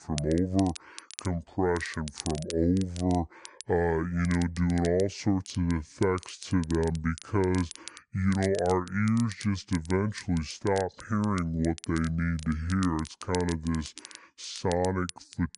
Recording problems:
wrong speed and pitch; too slow and too low; 0.7 times normal speed
crackle, like an old record; noticeable; 15 dB below the speech

